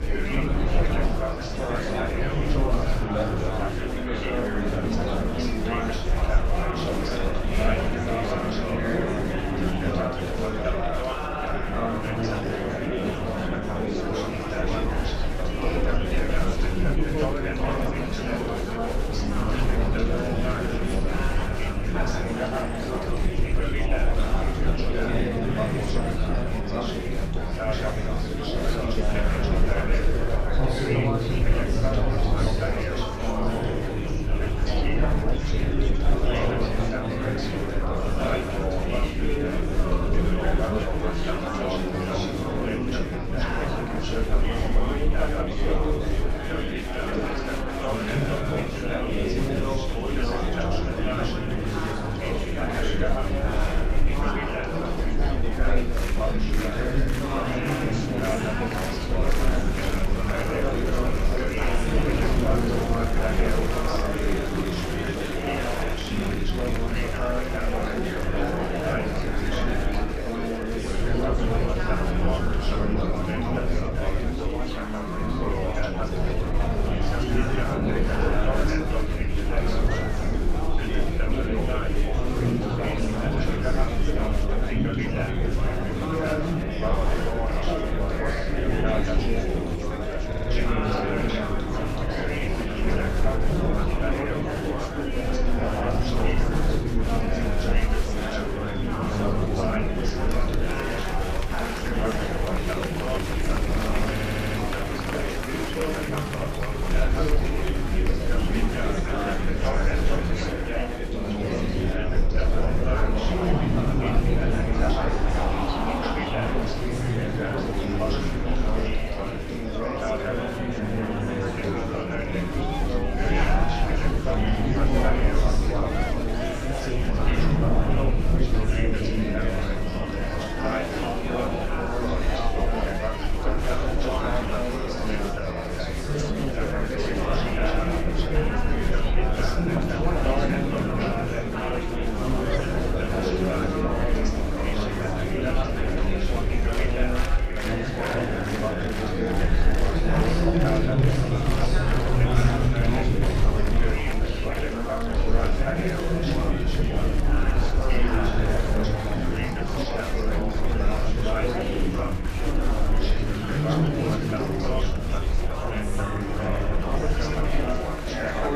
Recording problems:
room echo; strong; dies away in 2.3 s
off-mic speech; far
chatter from many people; very loud; throughout; 3 dB above the speech
low rumble; loud; throughout; 9 dB below the speech
audio stuttering; at 1:30 and at 1:44

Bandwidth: 14.5 kHz